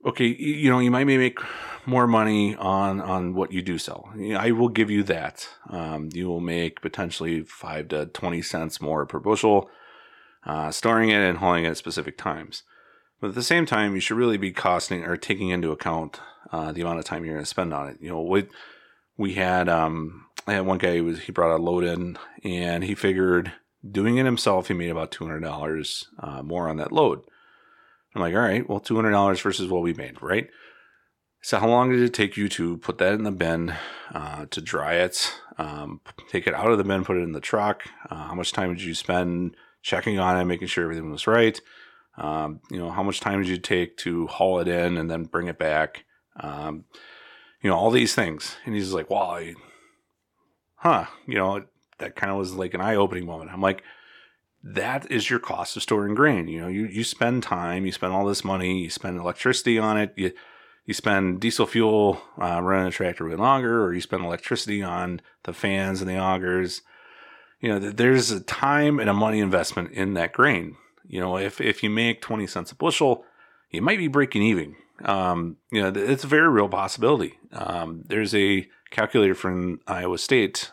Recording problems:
none

